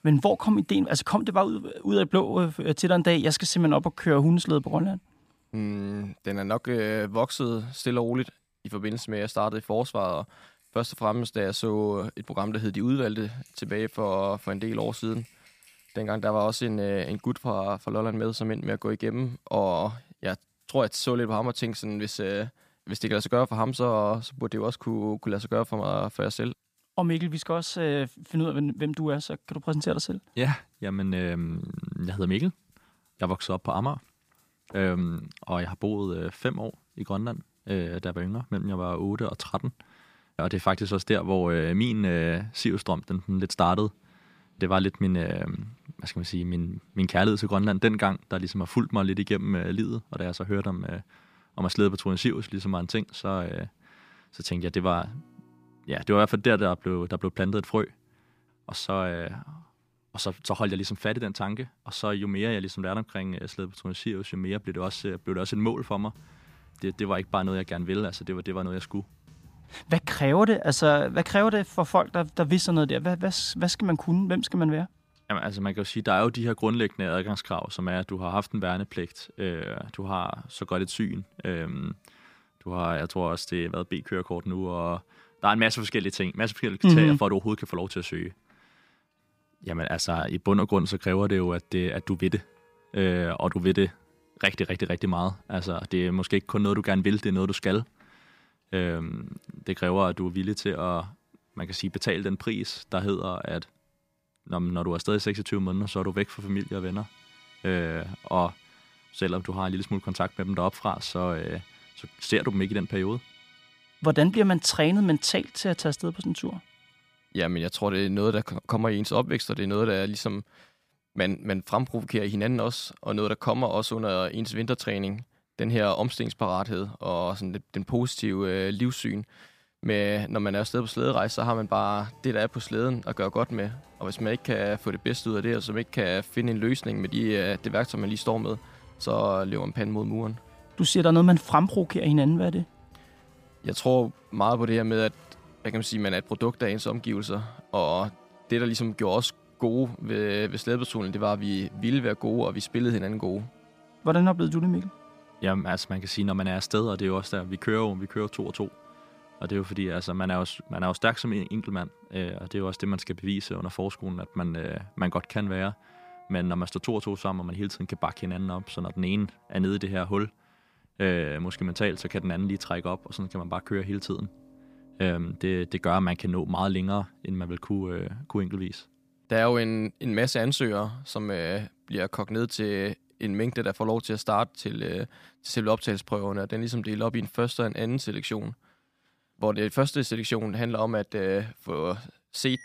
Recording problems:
background music; faint; throughout; 30 dB below the speech

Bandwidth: 15 kHz